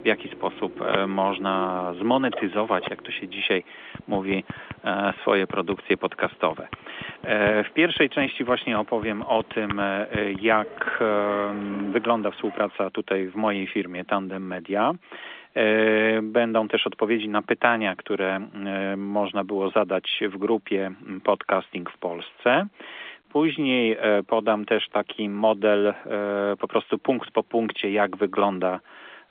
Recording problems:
phone-call audio; nothing above 3.5 kHz
household noises; noticeable; until 13 s; 15 dB below the speech

